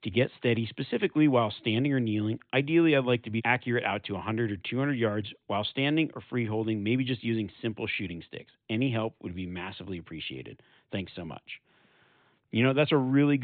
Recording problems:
high frequencies cut off; severe; nothing above 4 kHz
abrupt cut into speech; at the end

